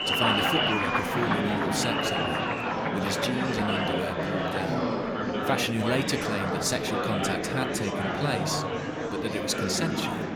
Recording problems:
murmuring crowd; very loud; throughout; 3 dB above the speech

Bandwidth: 18.5 kHz